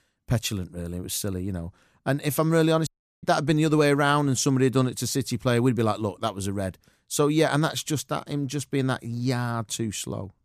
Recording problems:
audio cutting out; at 3 s

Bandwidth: 14.5 kHz